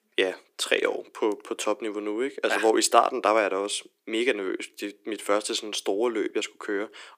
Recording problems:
thin; very; fading below 300 Hz

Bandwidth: 15 kHz